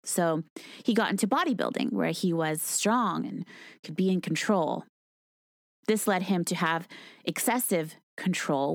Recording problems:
abrupt cut into speech; at the end

